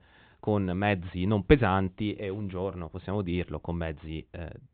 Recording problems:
high frequencies cut off; severe; nothing above 4 kHz

